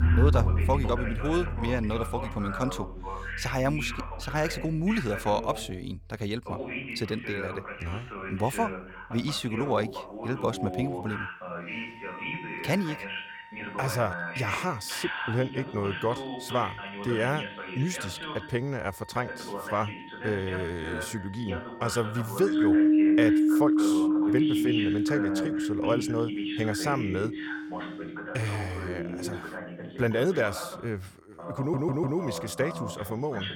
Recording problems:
background music; very loud; throughout; 4 dB above the speech
voice in the background; loud; throughout; 6 dB below the speech
audio stuttering; at 32 s

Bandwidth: 18 kHz